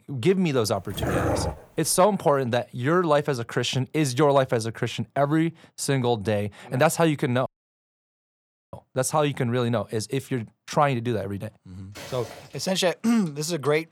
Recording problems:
dog barking; noticeable; at 1 s; peak 1 dB below the speech
audio cutting out; at 7.5 s for 1.5 s
footsteps; faint; at 12 s; peak 15 dB below the speech

